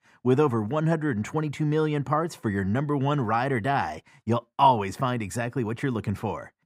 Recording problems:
muffled; slightly; fading above 2.5 kHz

